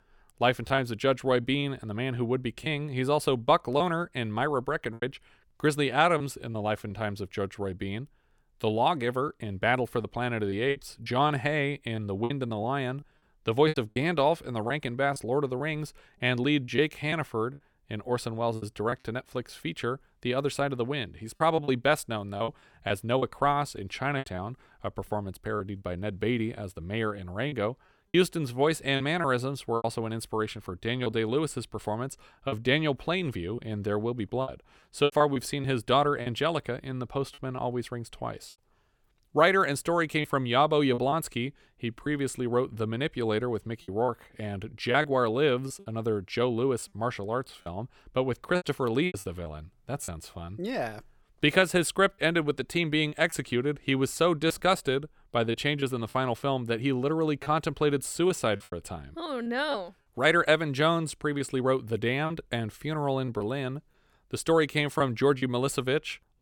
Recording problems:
choppy; very; 5% of the speech affected

